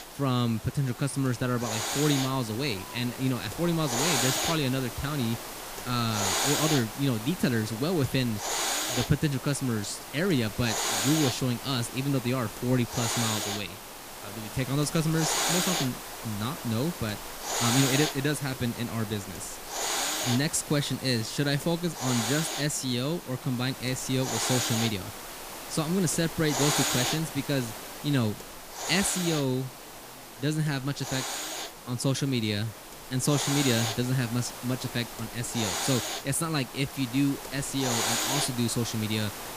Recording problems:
hiss; loud; throughout; 3 dB below the speech
murmuring crowd; faint; throughout; 25 dB below the speech

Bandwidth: 15 kHz